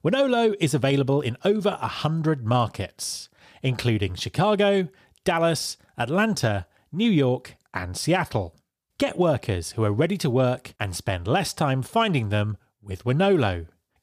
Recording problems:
none

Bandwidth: 15 kHz